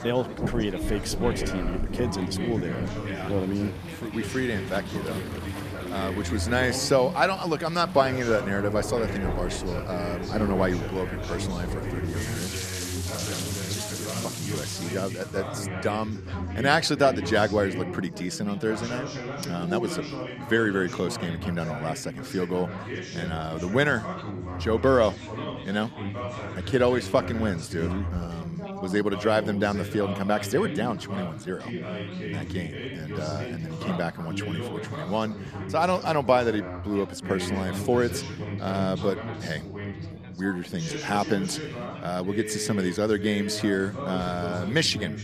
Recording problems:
rain or running water; loud; until 15 s; 8 dB below the speech
background chatter; loud; throughout; 3 voices, 7 dB below the speech

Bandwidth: 14.5 kHz